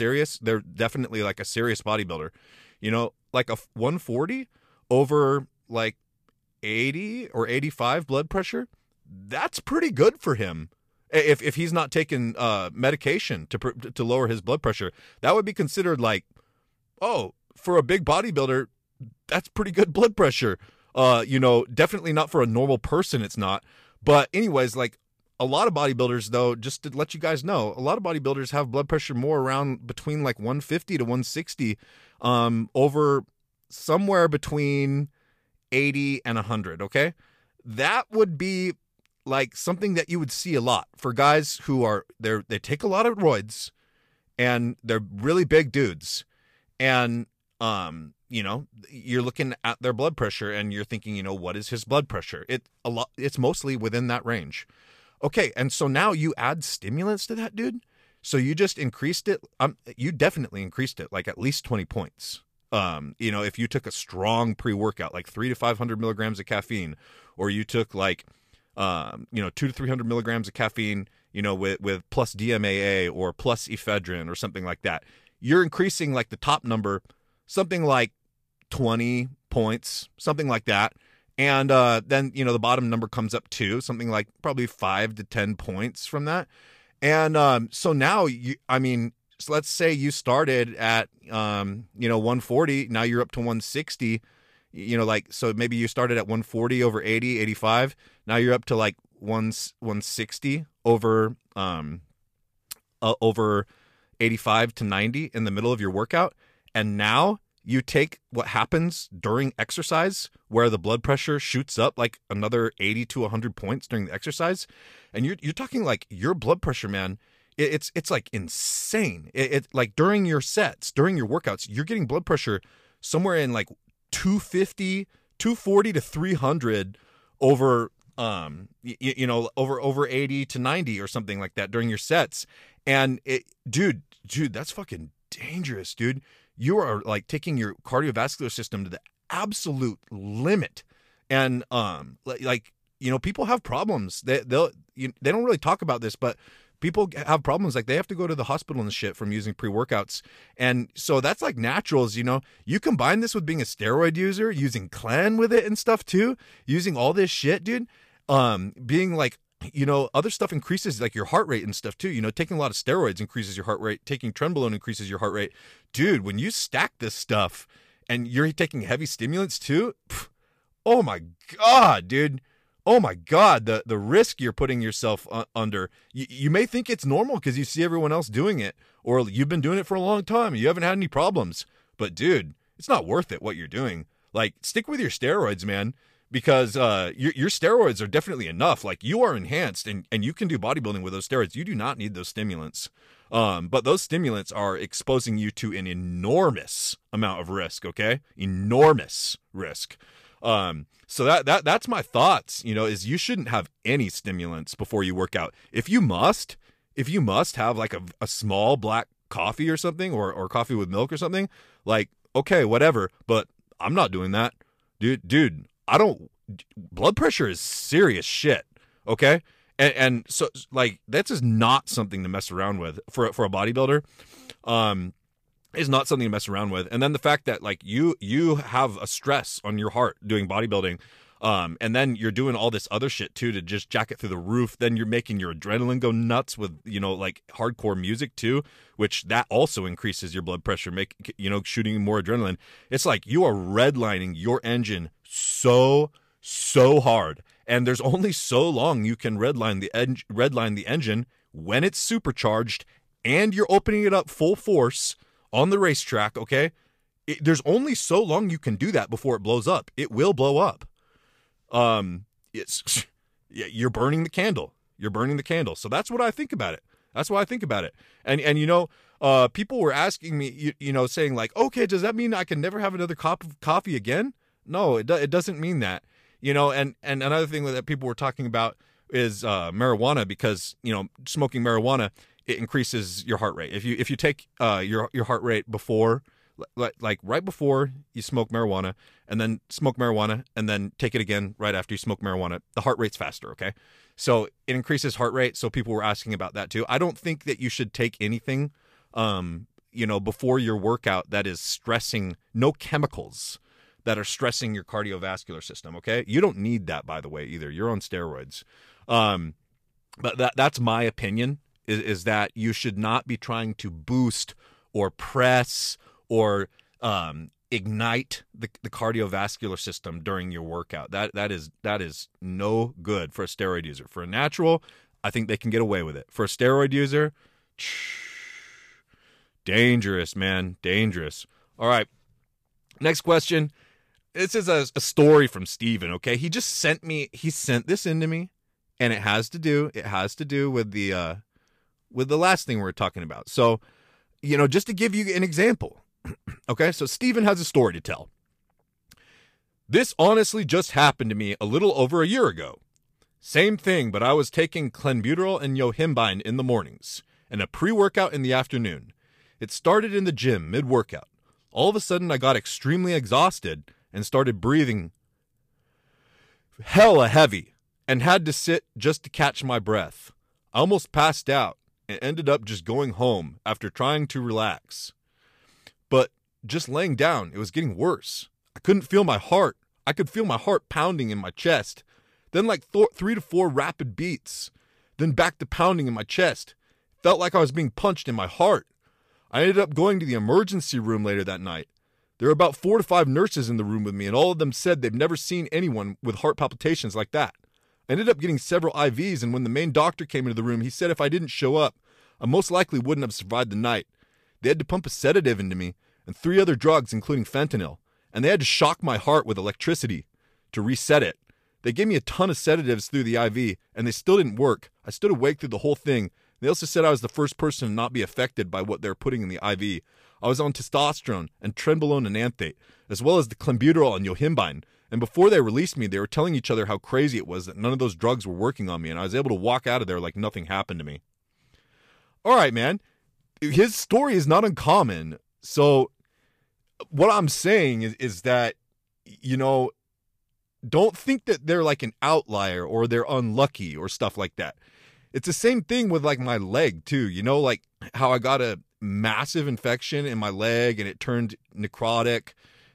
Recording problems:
abrupt cut into speech; at the start

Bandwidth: 15 kHz